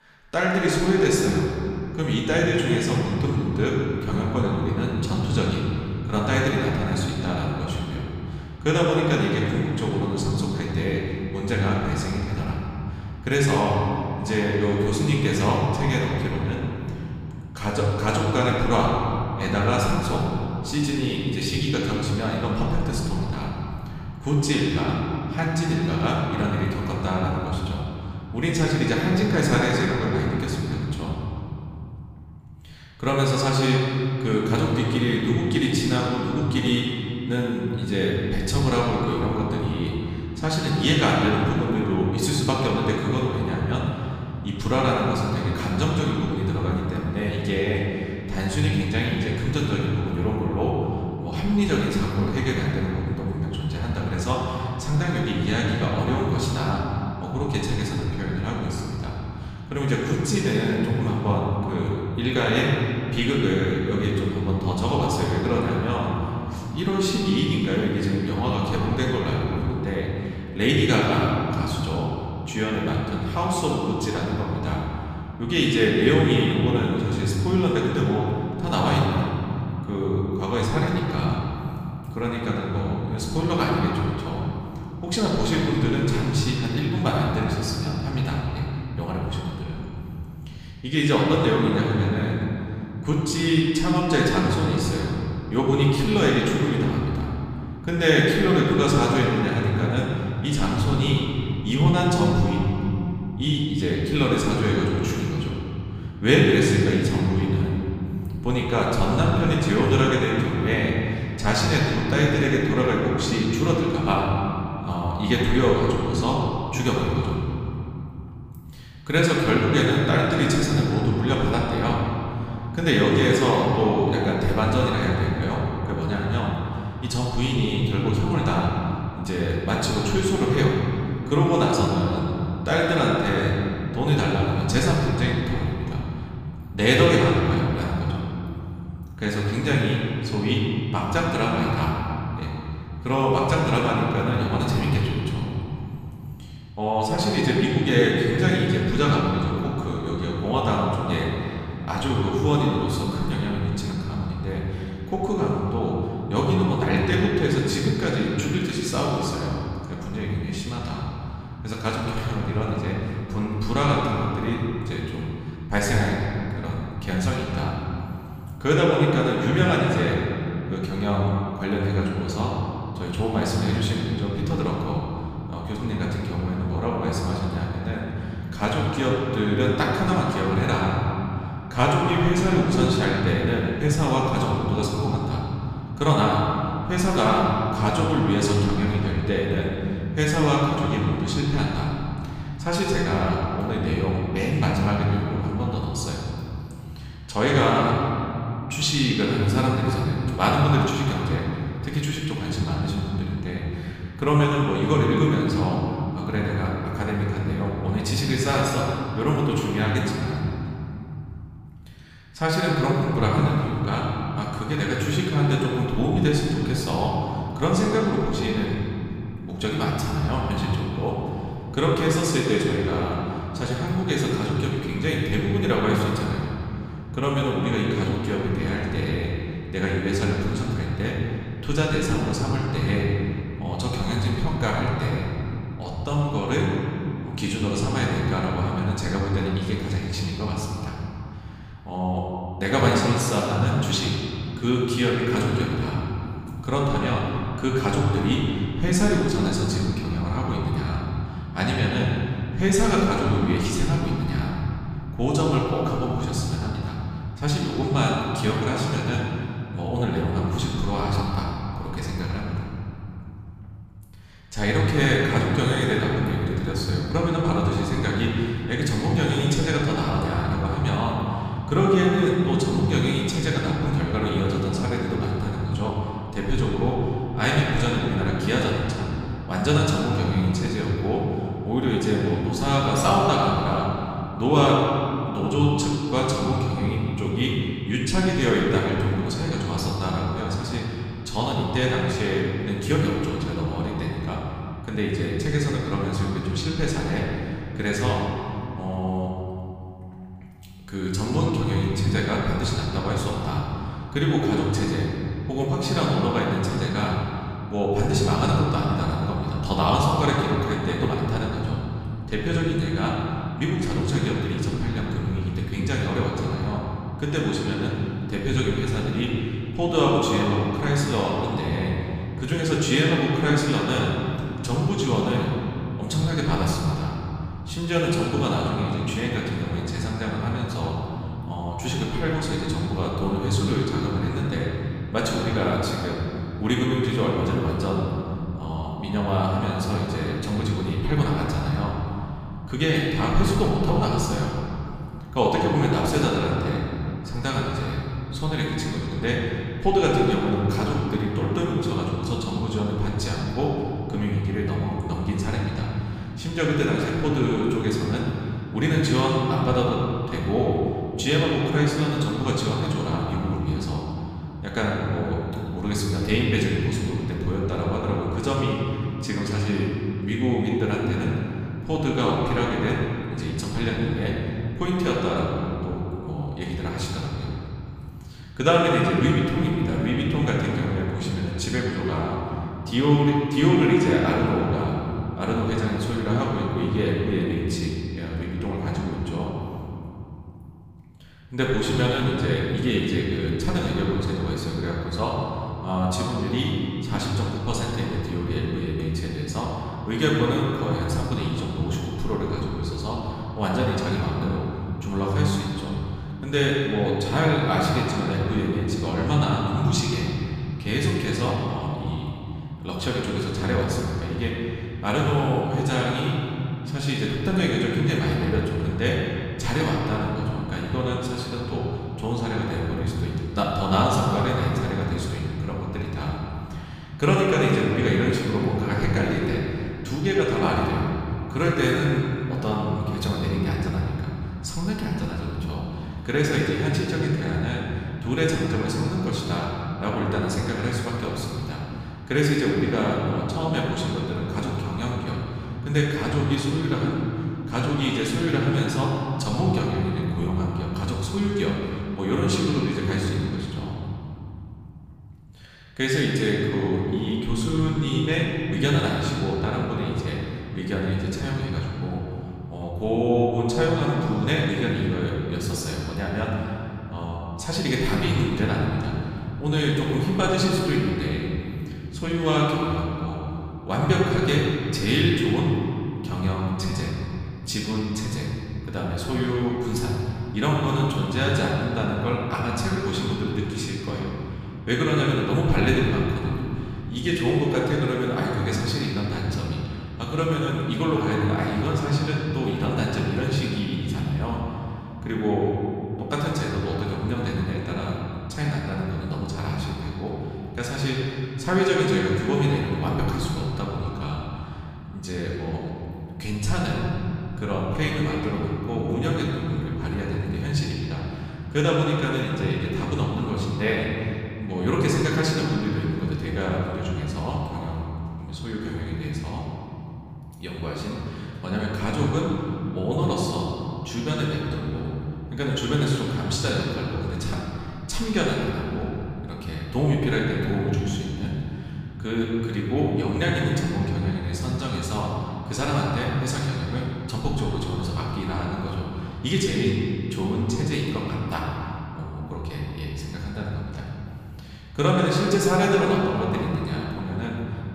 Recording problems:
off-mic speech; far
room echo; noticeable; dies away in 3 s

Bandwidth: 15 kHz